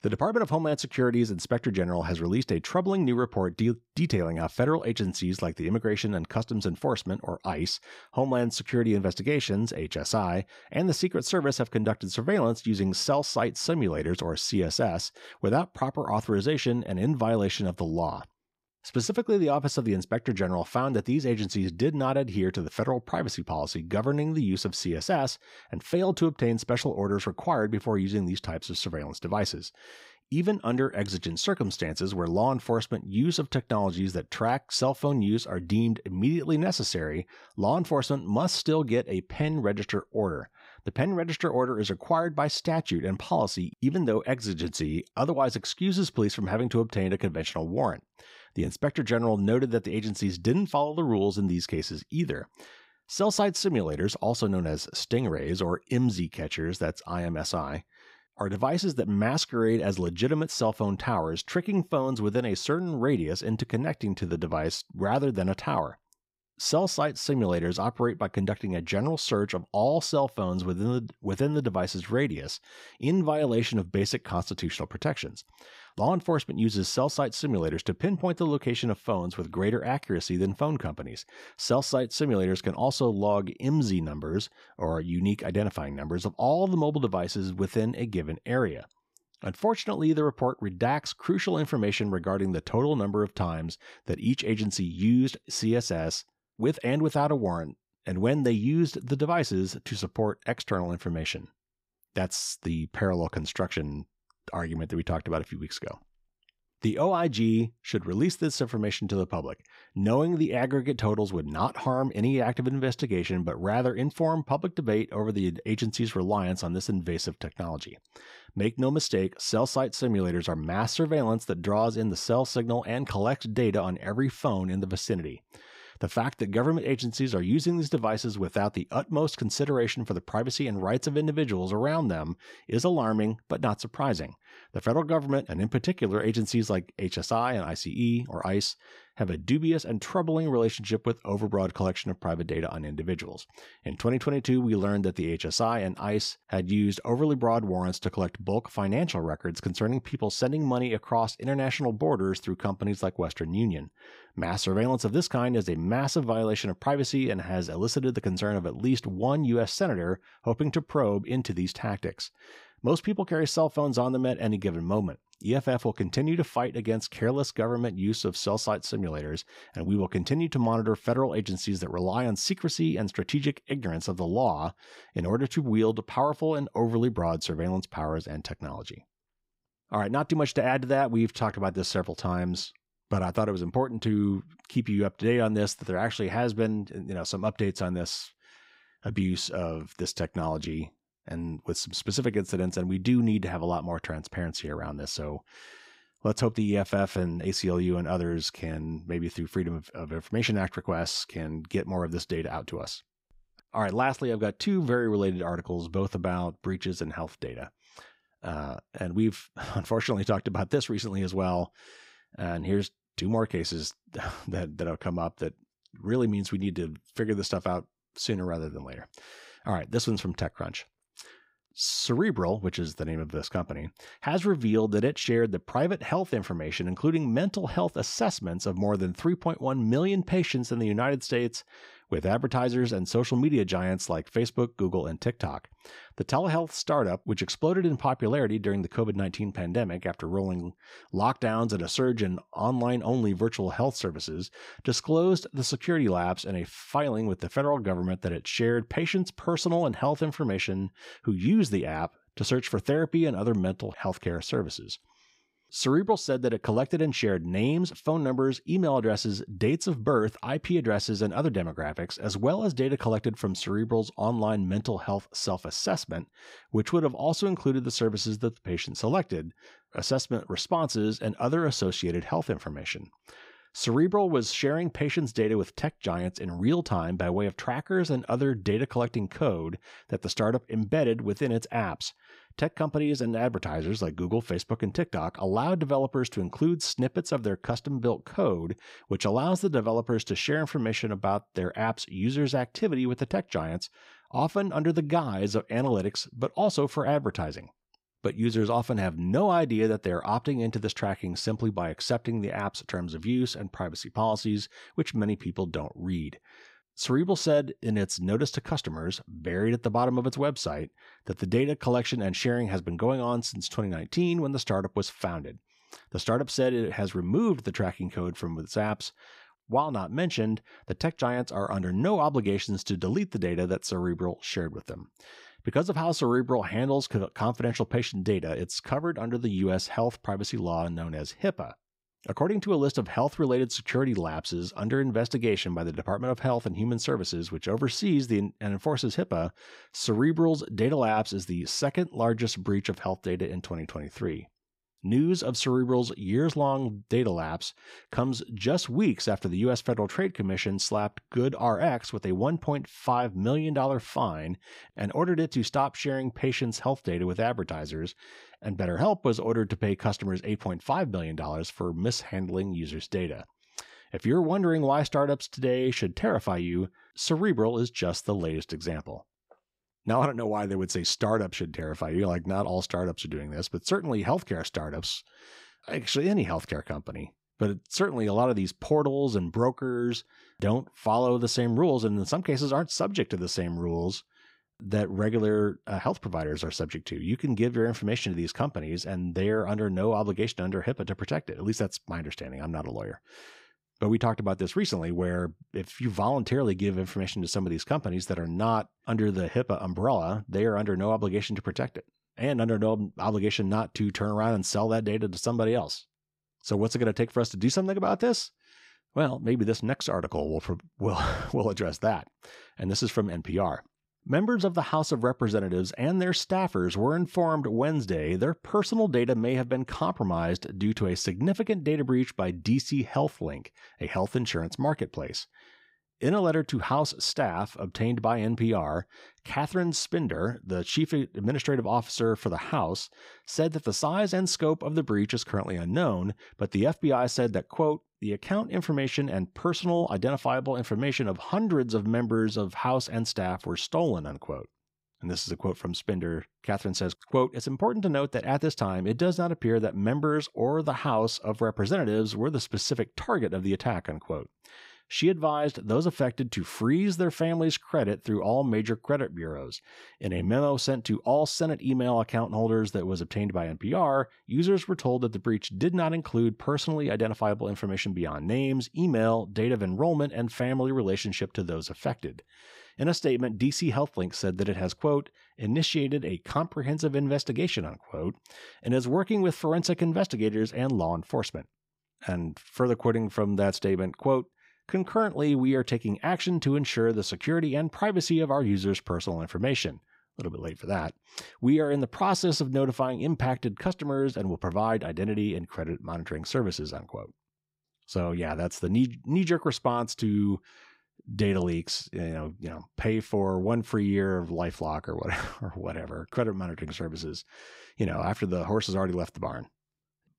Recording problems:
none

